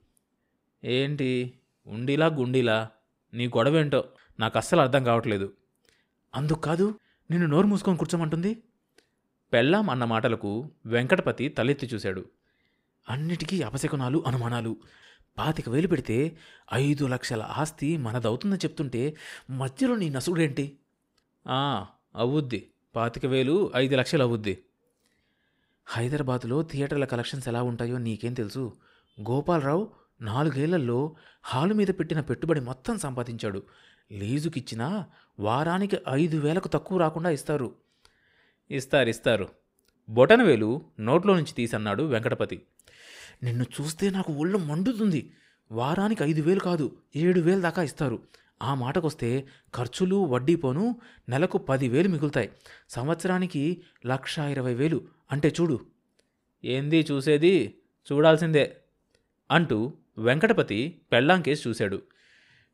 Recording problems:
none

